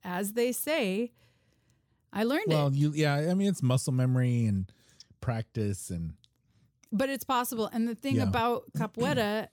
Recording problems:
none

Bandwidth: 18.5 kHz